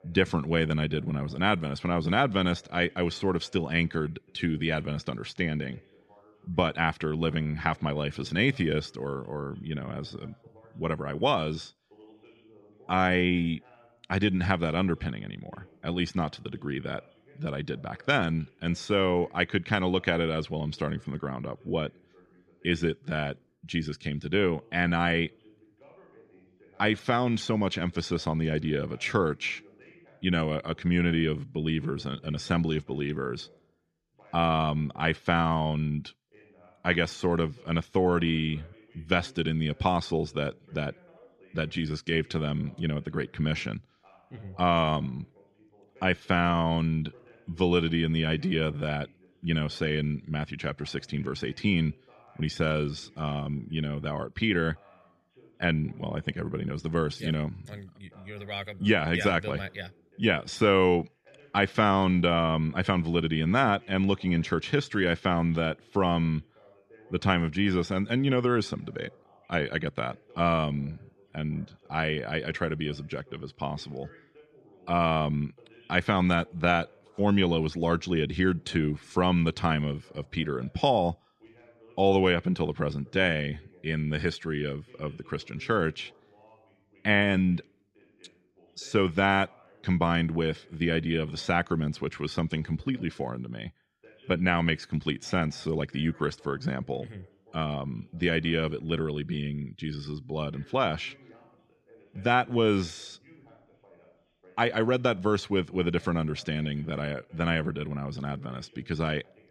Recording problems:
voice in the background; faint; throughout; 30 dB below the speech

